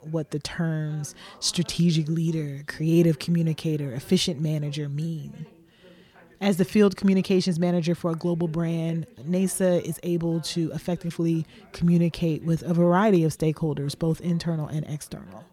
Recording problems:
background chatter; faint; throughout; 3 voices, 30 dB below the speech

